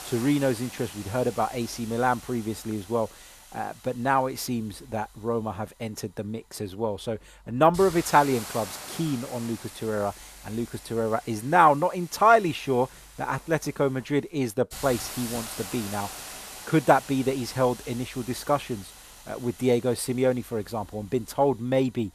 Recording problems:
hiss; noticeable; throughout; 15 dB below the speech

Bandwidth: 14.5 kHz